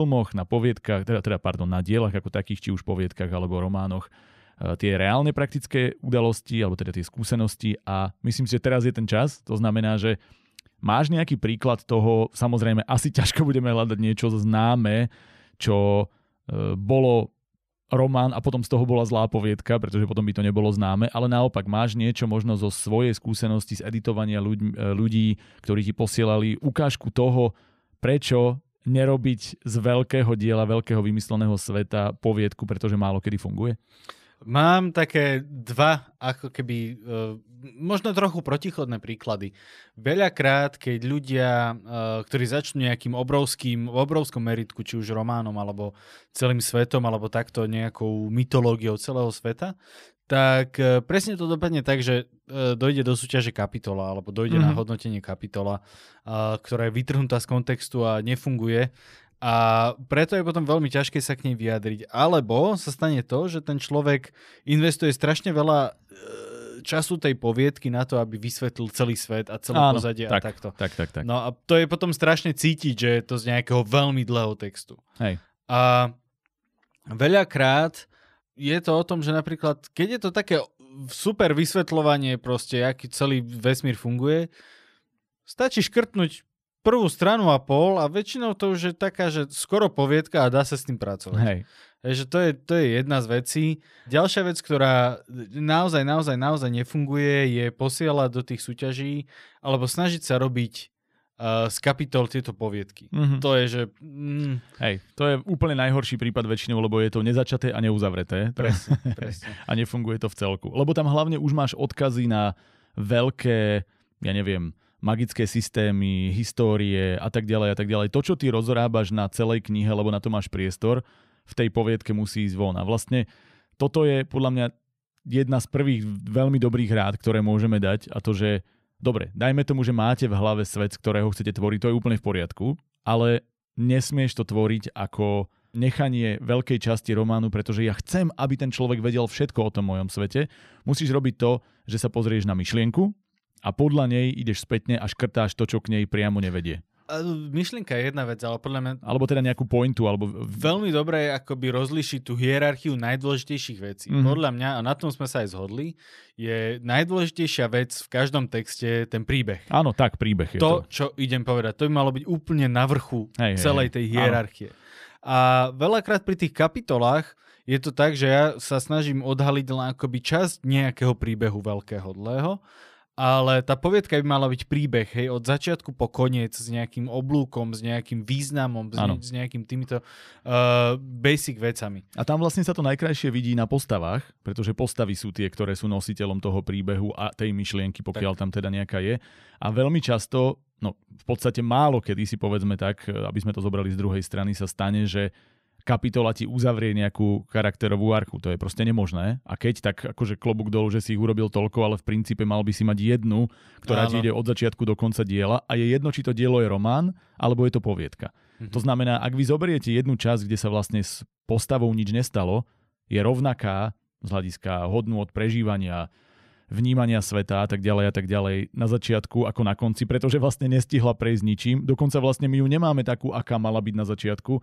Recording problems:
abrupt cut into speech; at the start

